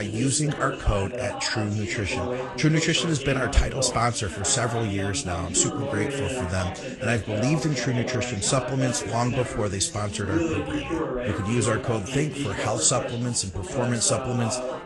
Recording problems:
garbled, watery; slightly
background chatter; loud; throughout; 3 voices, 6 dB below the speech
abrupt cut into speech; at the start

